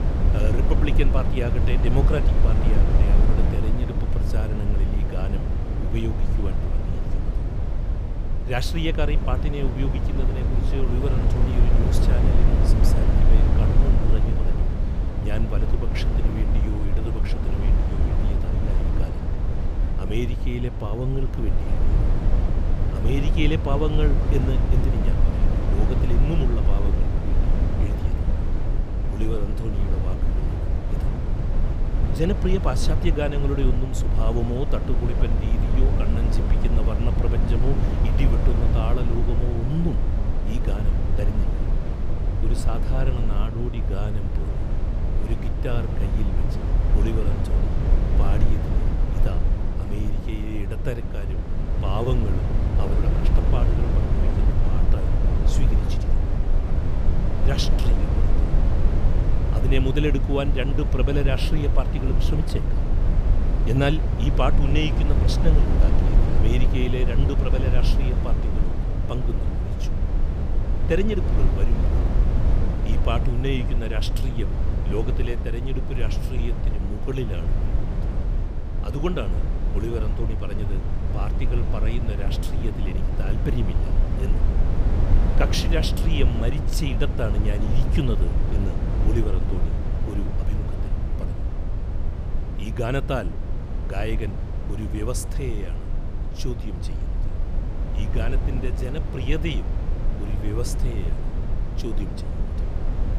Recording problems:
low rumble; loud; throughout; 3 dB below the speech

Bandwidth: 15 kHz